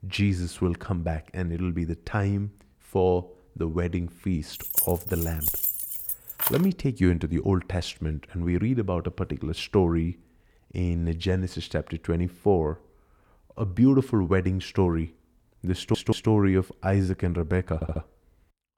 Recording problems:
jangling keys; loud; from 4.5 to 6.5 s; peak 3 dB above the speech
audio stuttering; at 16 s and at 18 s

